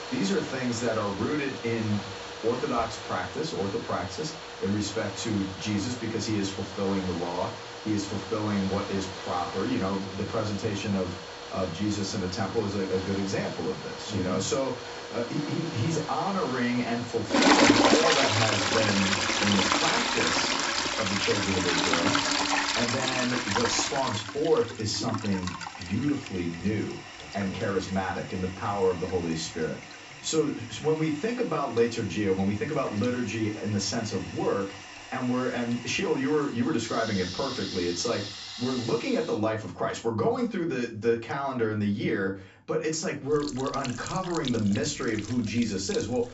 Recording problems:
off-mic speech; far
high frequencies cut off; noticeable; nothing above 7.5 kHz
room echo; very slight; dies away in 0.3 s
household noises; loud; throughout; 1 dB below the speech

